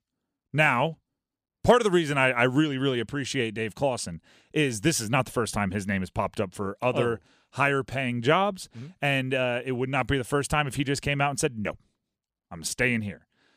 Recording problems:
none

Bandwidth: 14.5 kHz